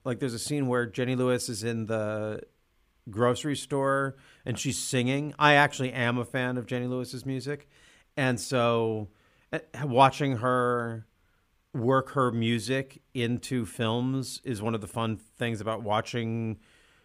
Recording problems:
none

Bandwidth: 15 kHz